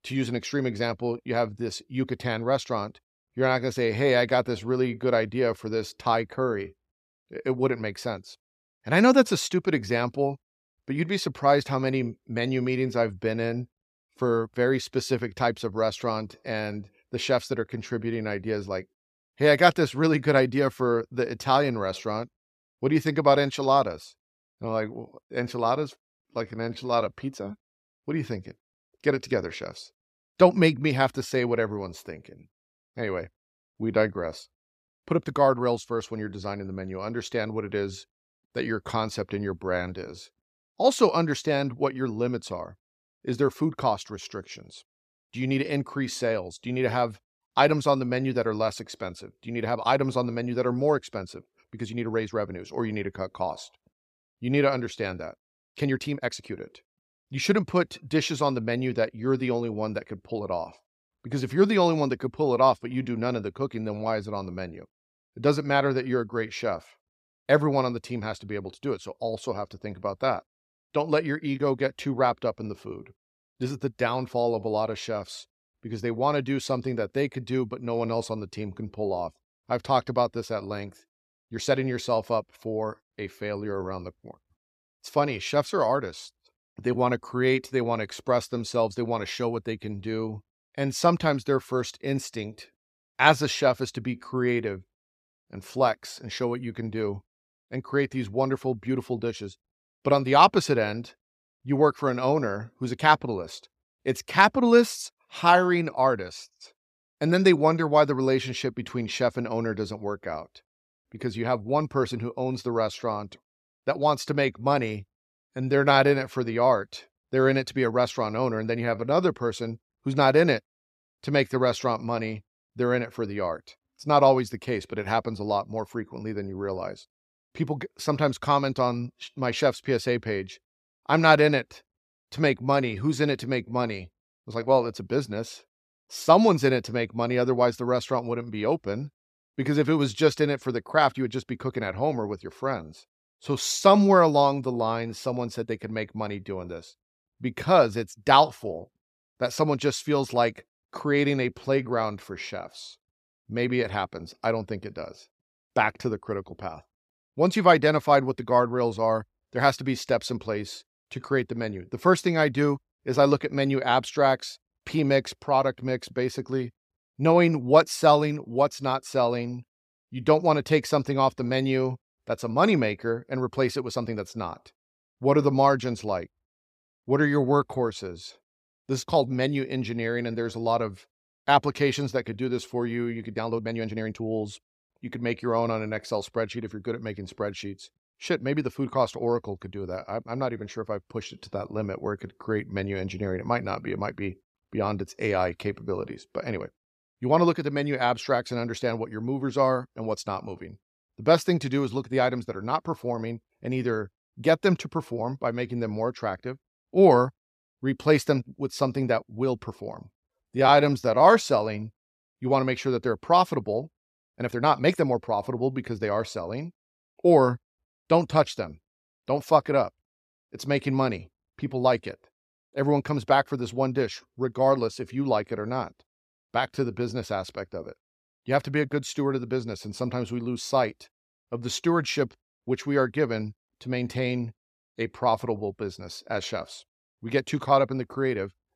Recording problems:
uneven, jittery; strongly; from 26 s to 3:35

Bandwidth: 14.5 kHz